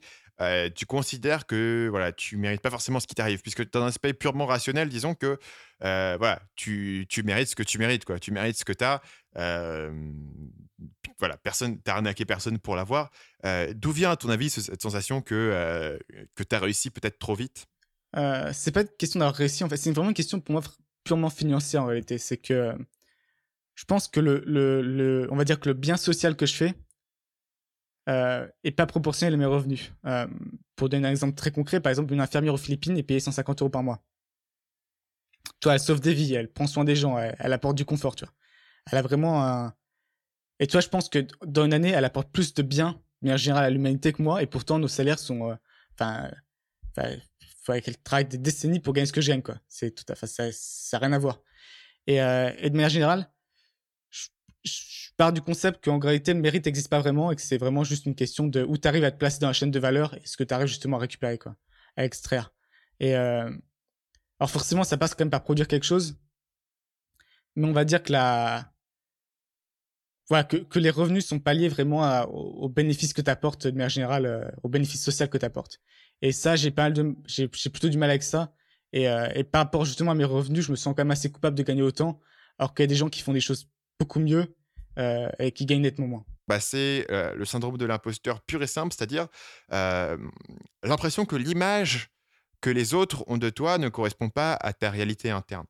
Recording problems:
none

